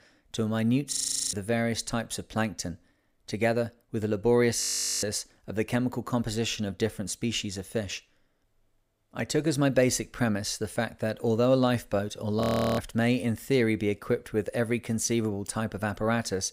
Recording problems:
audio freezing; at 1 s, at 4.5 s and at 12 s

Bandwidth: 15.5 kHz